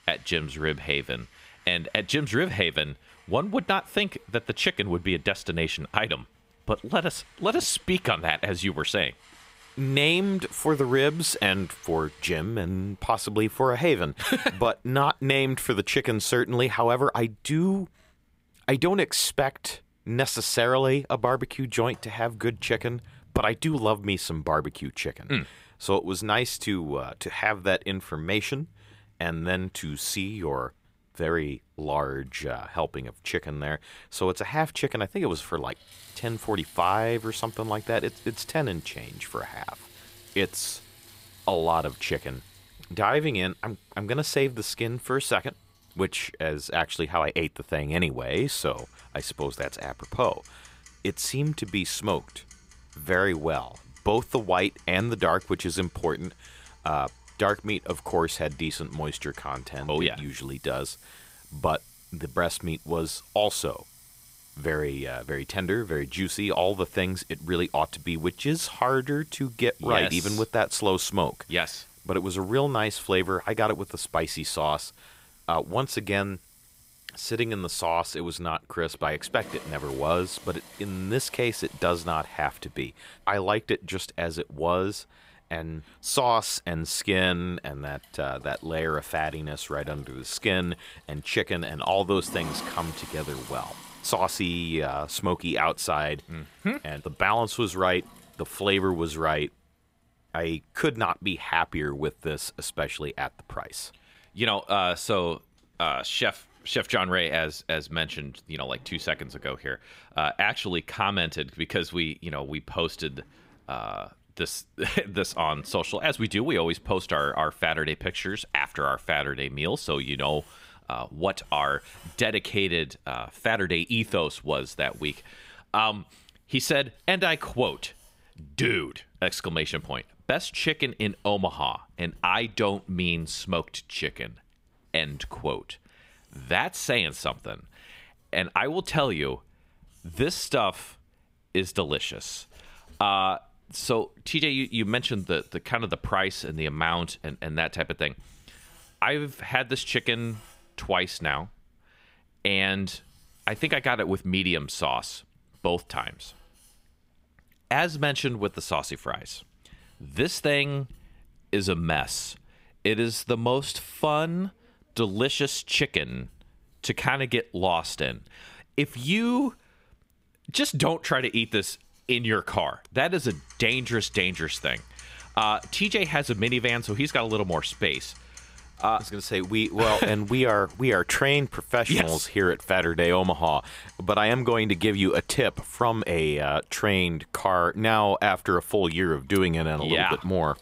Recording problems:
household noises; faint; throughout; 25 dB below the speech

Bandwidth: 15.5 kHz